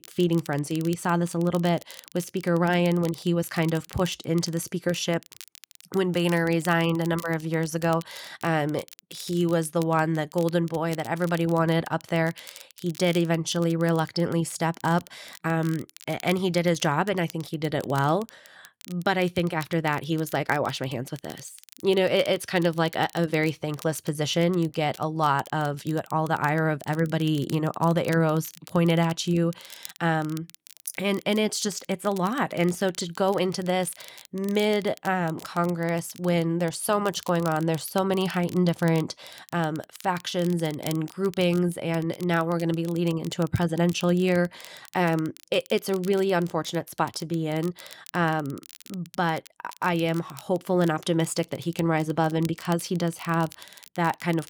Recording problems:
crackle, like an old record; faint; 20 dB below the speech

